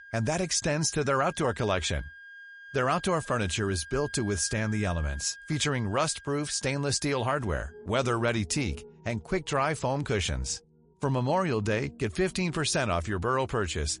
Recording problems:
garbled, watery; slightly; nothing above 10.5 kHz
background music; noticeable; throughout; 20 dB below the speech

